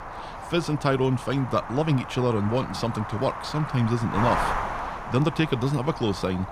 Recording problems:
wind noise on the microphone; heavy; 3 dB below the speech

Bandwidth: 15 kHz